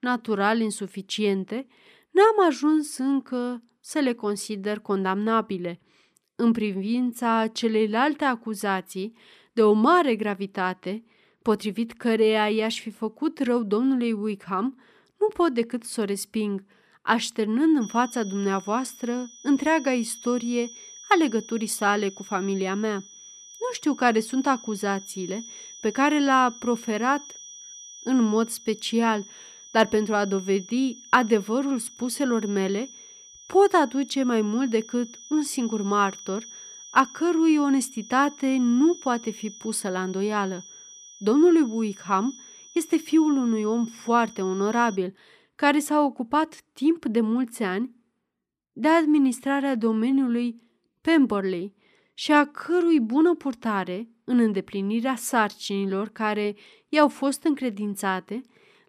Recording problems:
high-pitched whine; noticeable; from 18 to 45 s; 6 kHz, 20 dB below the speech

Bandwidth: 14.5 kHz